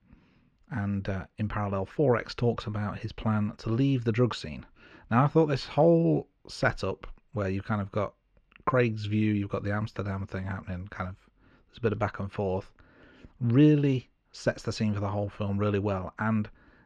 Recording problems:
muffled; slightly; fading above 4 kHz

